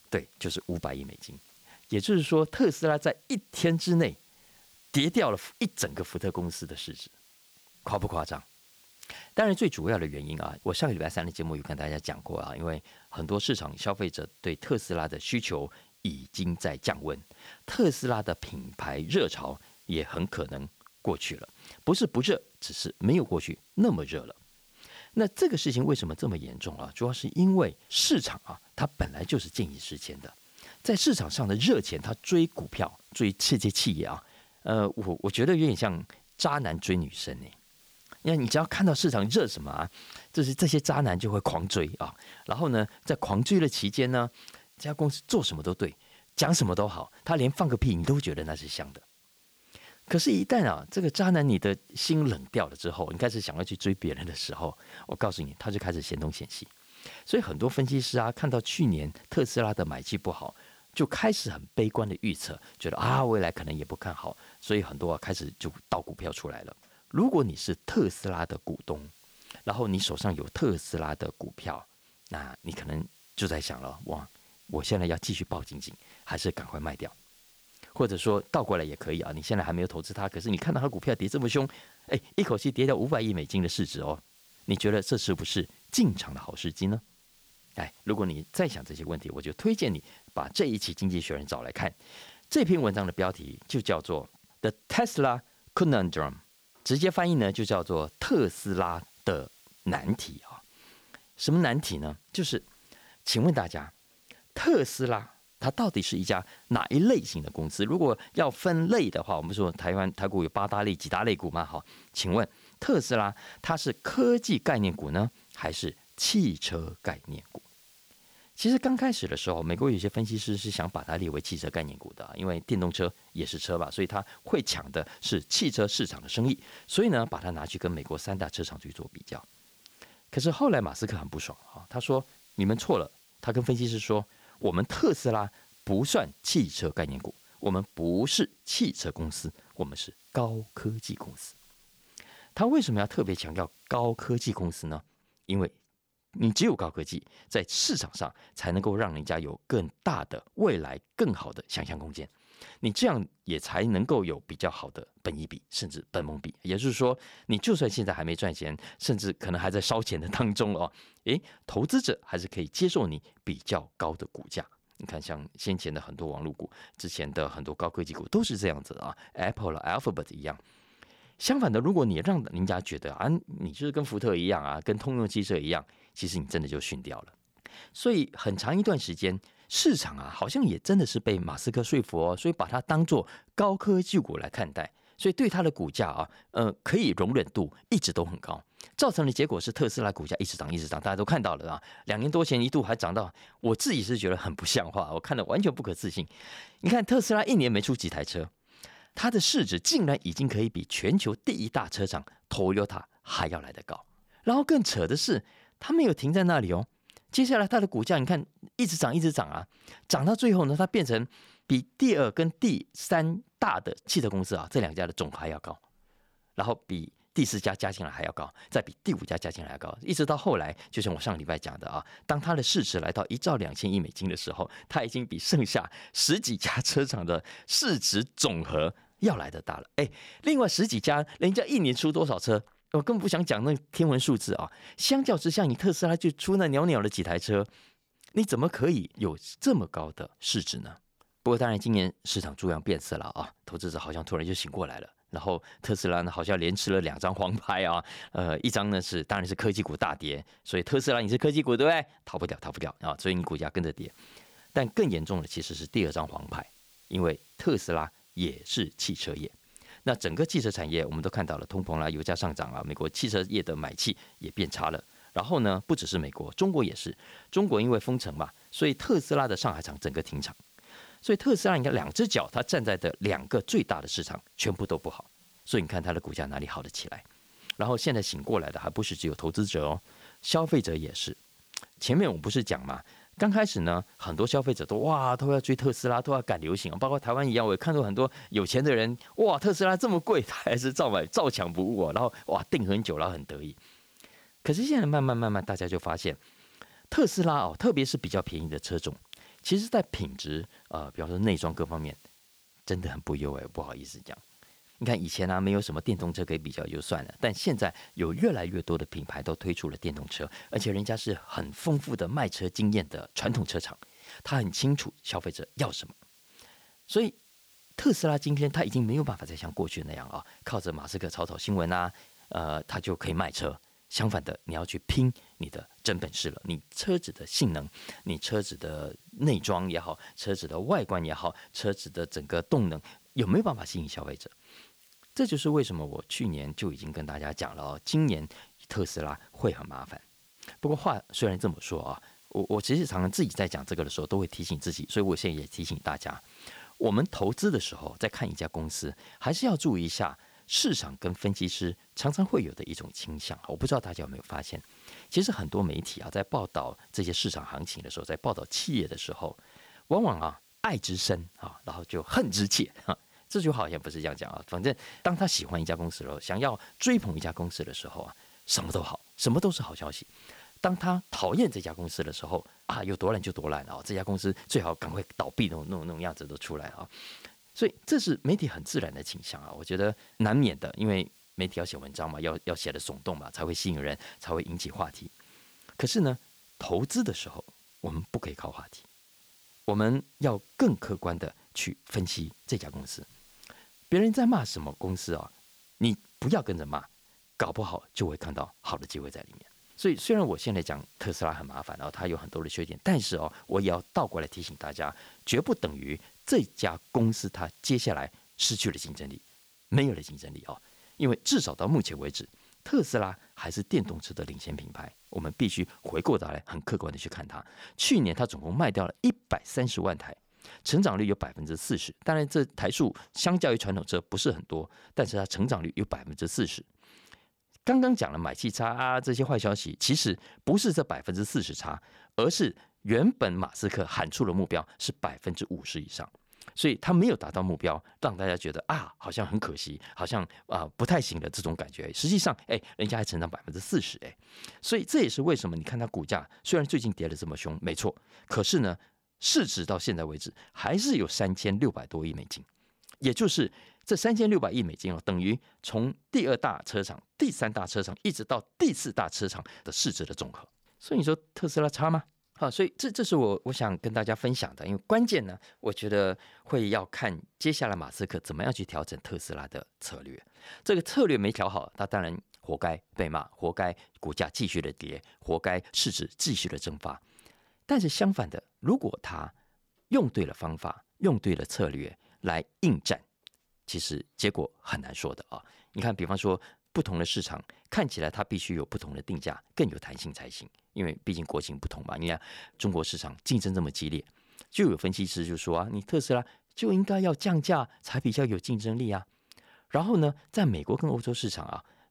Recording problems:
hiss; faint; until 2:25 and from 4:14 to 6:56; 30 dB below the speech

